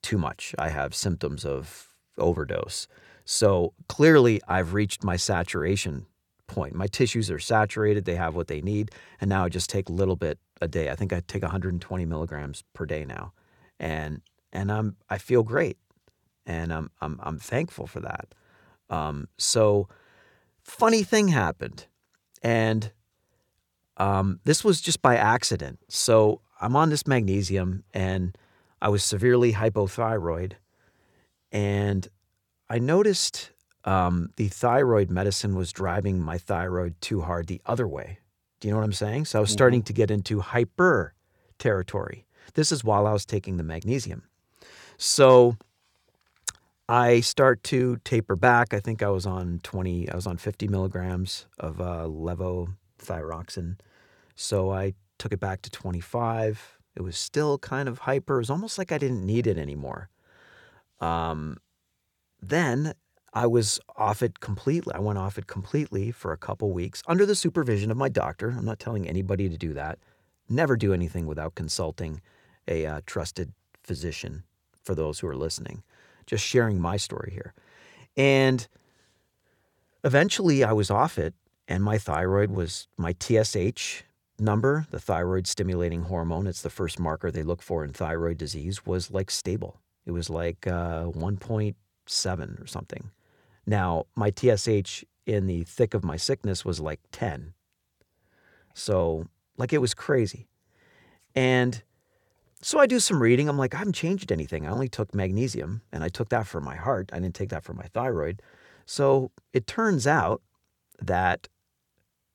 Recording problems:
none

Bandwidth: 18 kHz